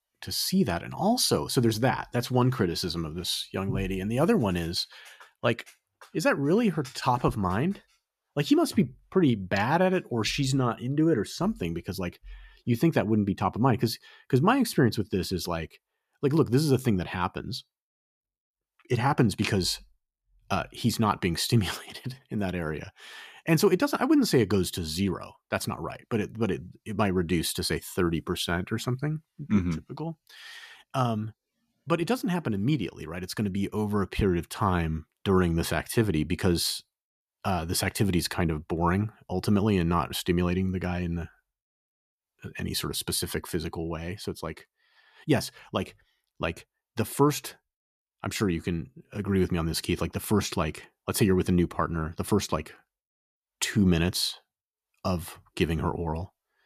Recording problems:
none

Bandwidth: 14.5 kHz